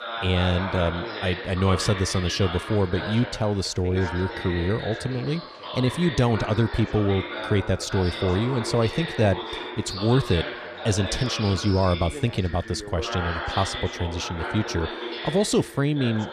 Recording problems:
background chatter; loud; throughout; 2 voices, 7 dB below the speech

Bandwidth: 14.5 kHz